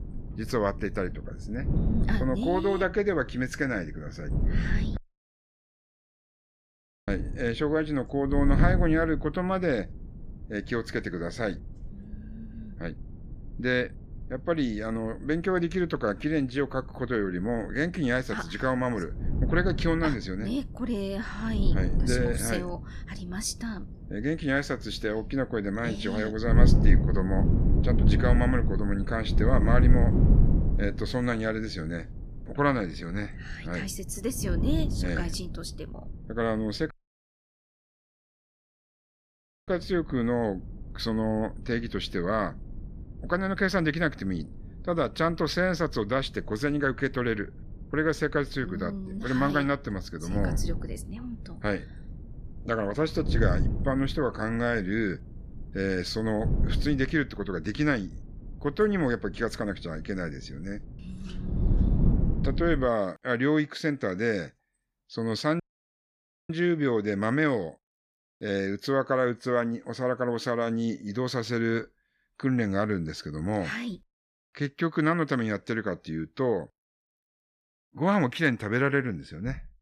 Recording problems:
wind noise on the microphone; occasional gusts; until 1:03; 10 dB below the speech
audio cutting out; at 5 s for 2 s, at 37 s for 3 s and at 1:06 for 1 s

